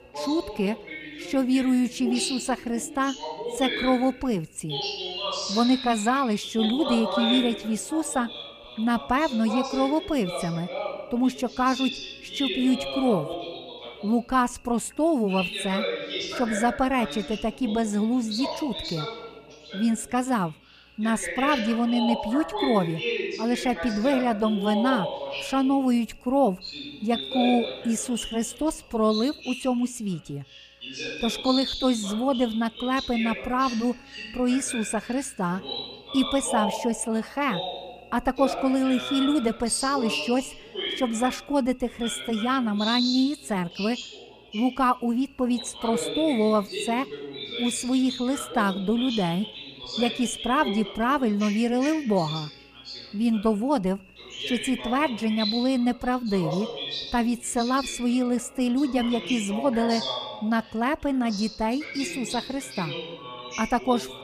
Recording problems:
voice in the background; loud; throughout; 7 dB below the speech
electrical hum; faint; throughout; 60 Hz, 25 dB below the speech

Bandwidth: 15 kHz